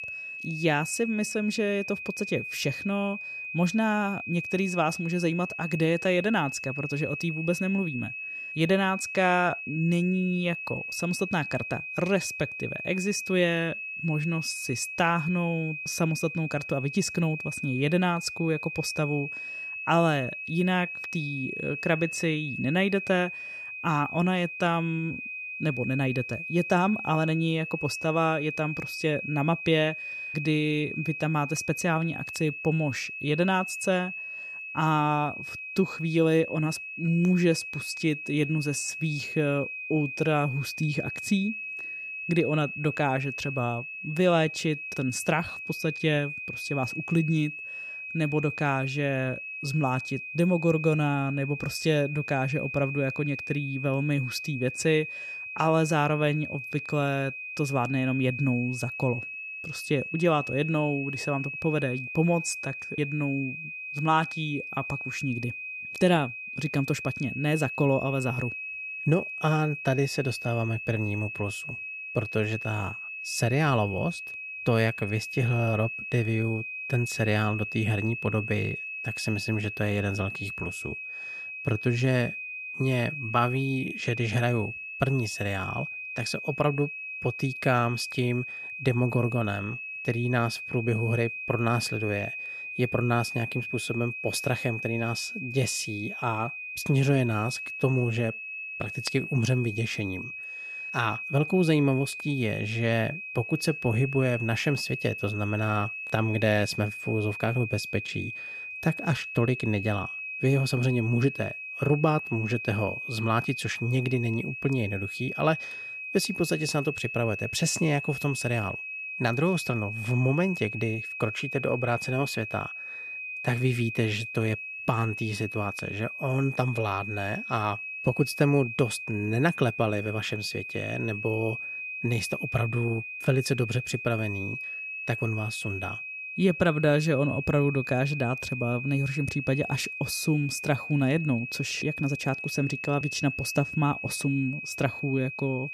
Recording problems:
high-pitched whine; loud; throughout; 2.5 kHz, 6 dB below the speech

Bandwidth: 14 kHz